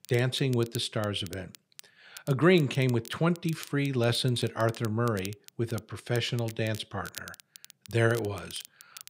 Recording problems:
crackle, like an old record; noticeable; 20 dB below the speech

